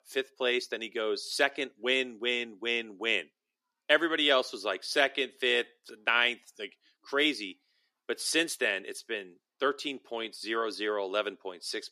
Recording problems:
thin; somewhat; fading below 300 Hz

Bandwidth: 14.5 kHz